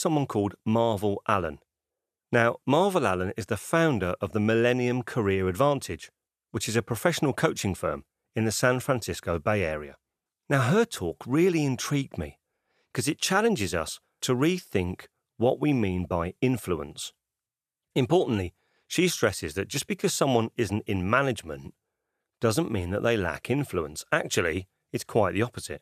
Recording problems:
abrupt cut into speech; at the start

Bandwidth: 14.5 kHz